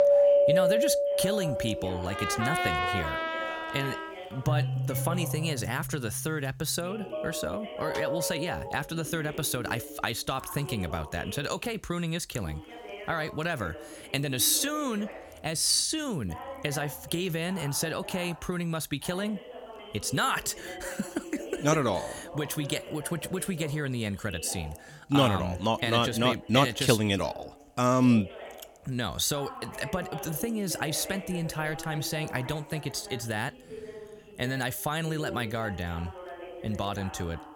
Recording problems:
background music; very loud; until 8.5 s; 1 dB above the speech
voice in the background; noticeable; throughout; 15 dB below the speech

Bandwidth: 17.5 kHz